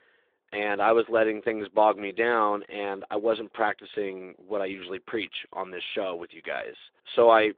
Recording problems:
phone-call audio

